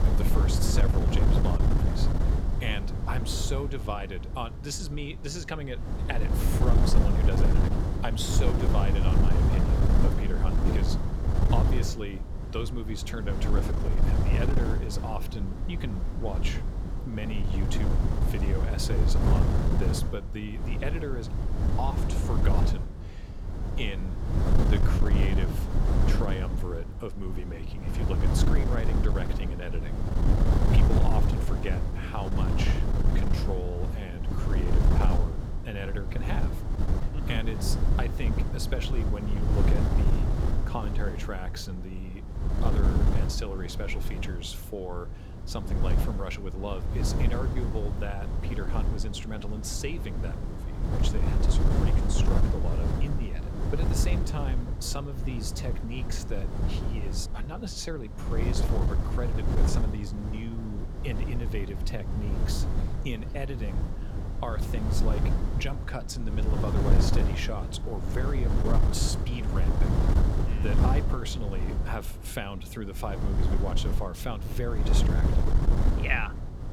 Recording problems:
wind noise on the microphone; heavy; 1 dB below the speech

